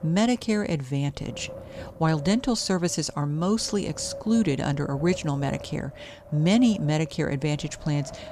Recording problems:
wind noise on the microphone; occasional gusts; 15 dB below the speech

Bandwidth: 15 kHz